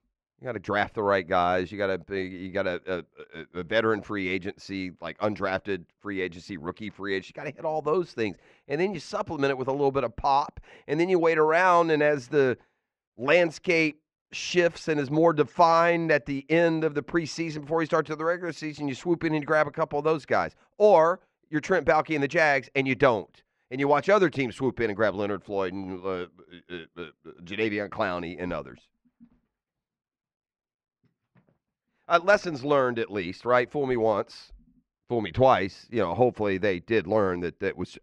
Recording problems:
muffled; slightly; fading above 2.5 kHz

